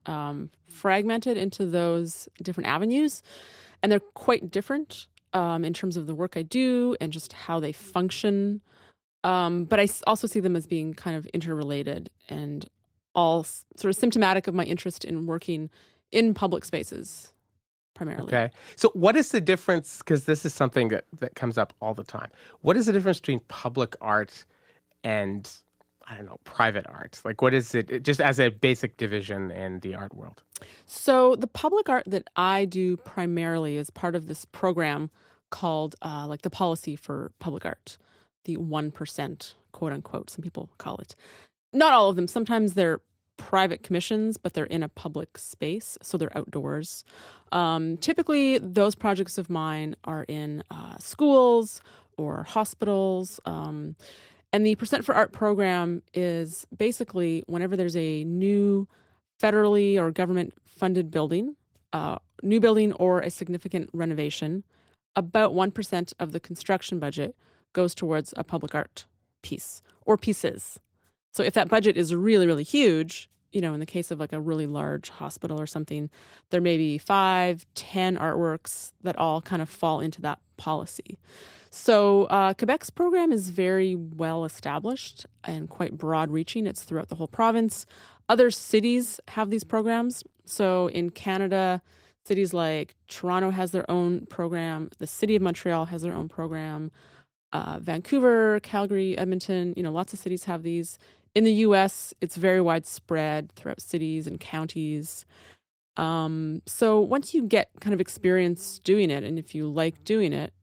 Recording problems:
garbled, watery; slightly; nothing above 15.5 kHz

